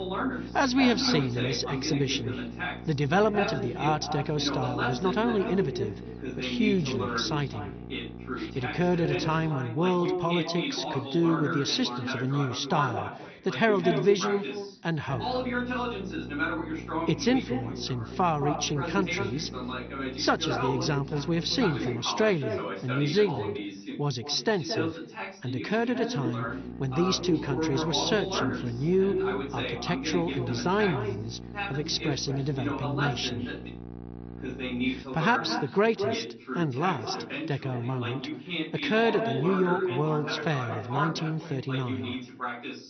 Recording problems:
echo of what is said; strong; throughout; 220 ms later, 8 dB below the speech
garbled, watery; slightly; nothing above 6 kHz
voice in the background; loud; throughout; 6 dB below the speech
electrical hum; noticeable; until 9.5 s, from 15 to 22 s and from 26 to 35 s; 60 Hz, 20 dB below the speech

